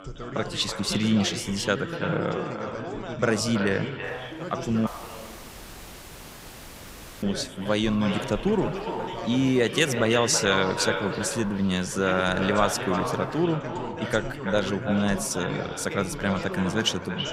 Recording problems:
echo of what is said; strong; throughout; 330 ms later, 8 dB below the speech
background chatter; loud; throughout; 3 voices, 9 dB below the speech
wind noise on the microphone; occasional gusts; from 4 to 13 s; 20 dB below the speech
audio cutting out; at 5 s for 2.5 s

